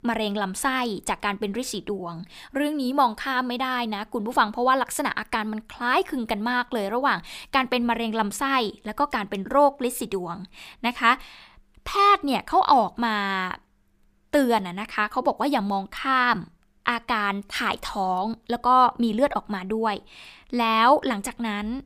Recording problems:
none

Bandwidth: 15 kHz